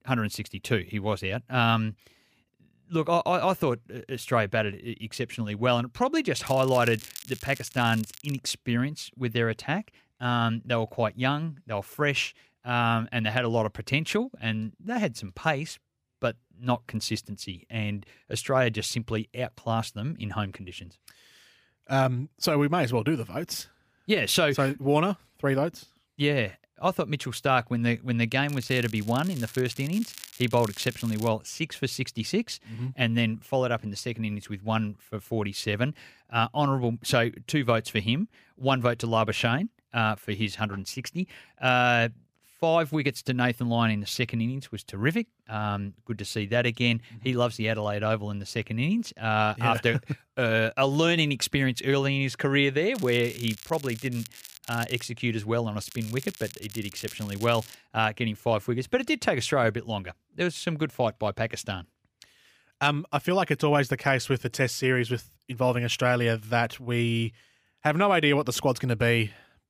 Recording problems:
crackling; noticeable; 4 times, first at 6.5 s; 15 dB below the speech

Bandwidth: 15 kHz